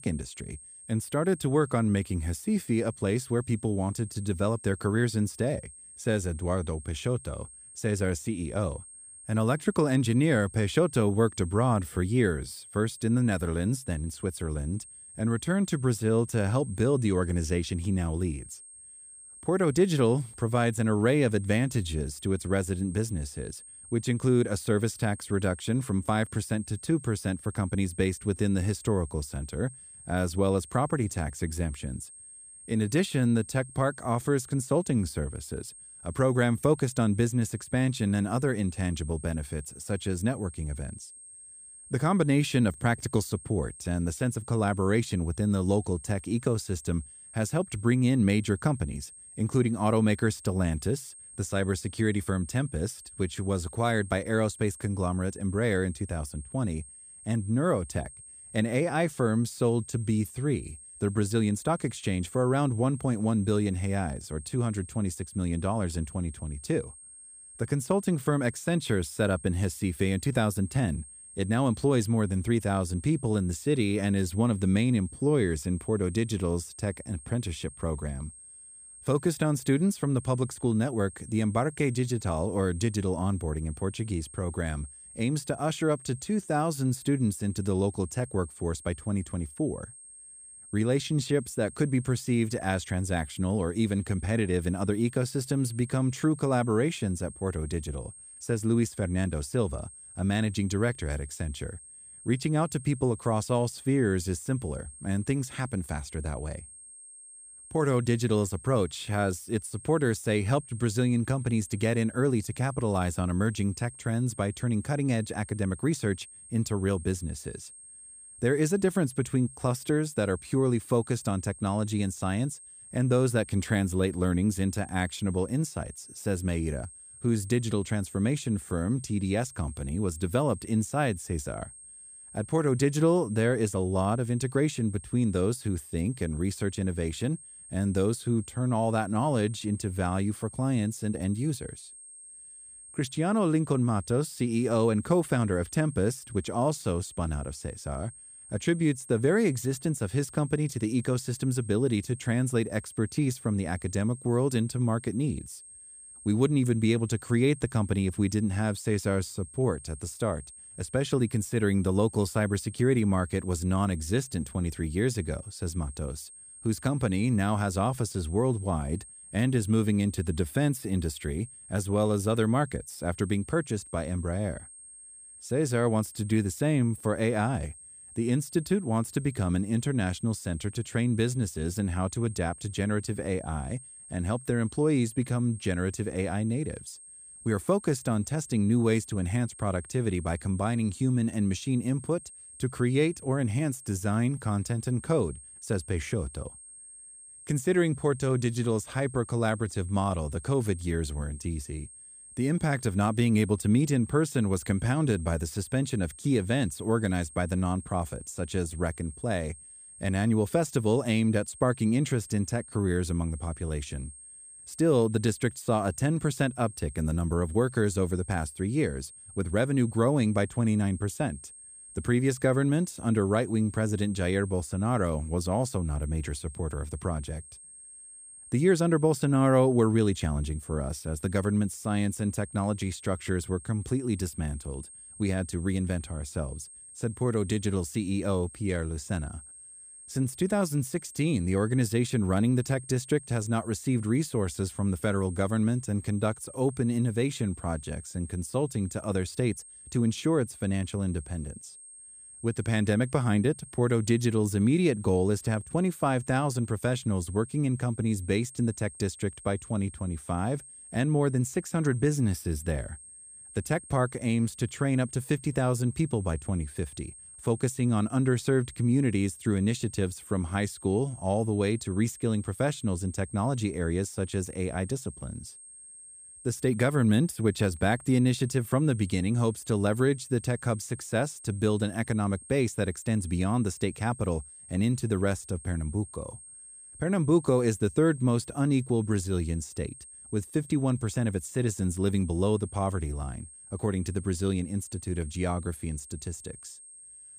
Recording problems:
high-pitched whine; noticeable; throughout; 8.5 kHz, 15 dB below the speech

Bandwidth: 15 kHz